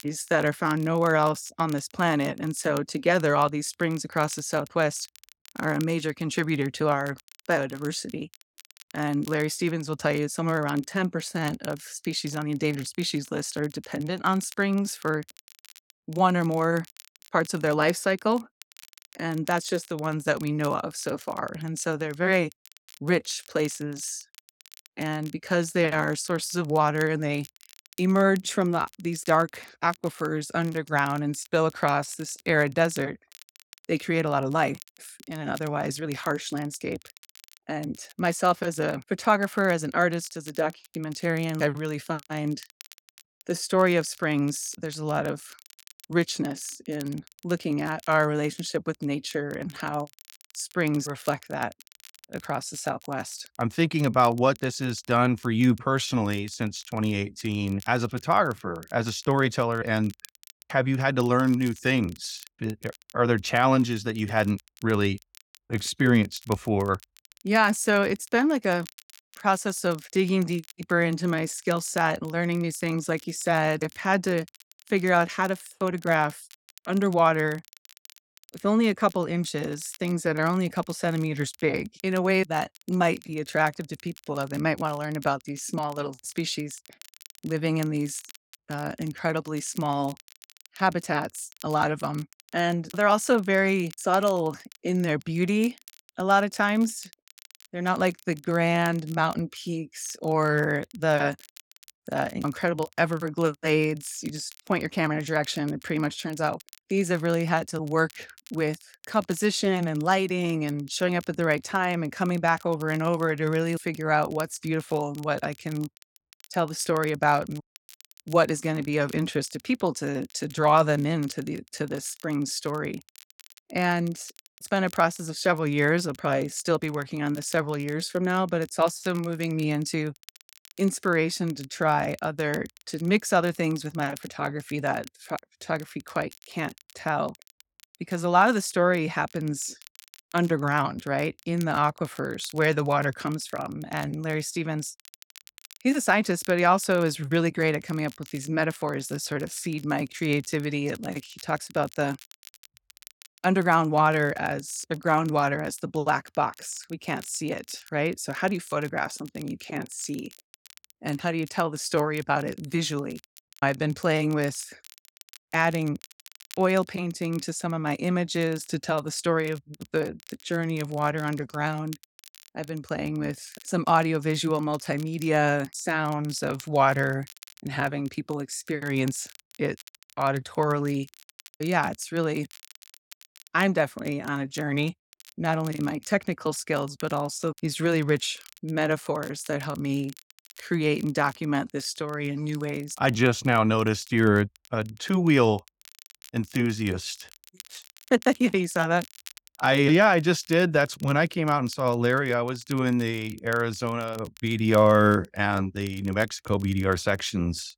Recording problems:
crackle, like an old record; faint; 25 dB below the speech

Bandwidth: 17 kHz